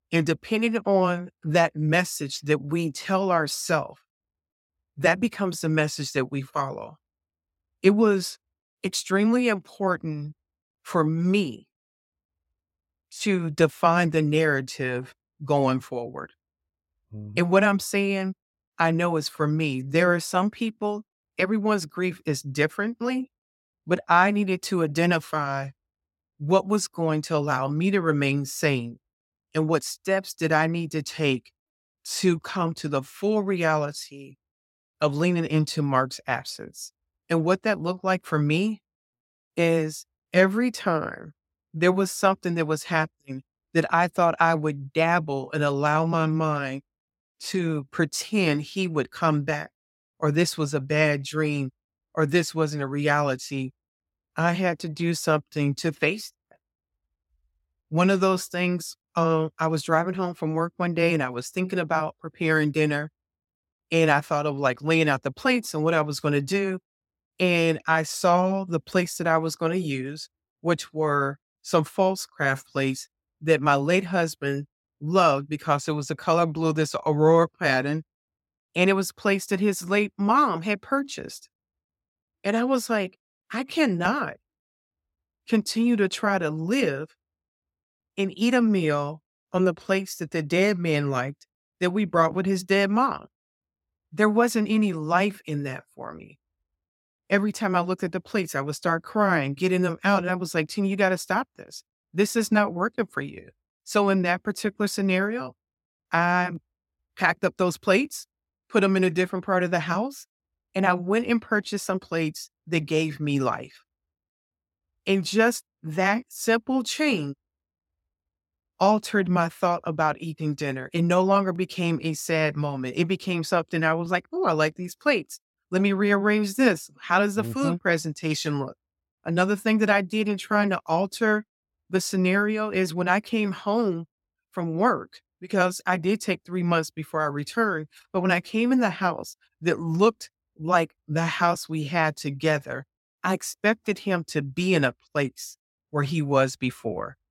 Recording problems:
none

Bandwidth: 16.5 kHz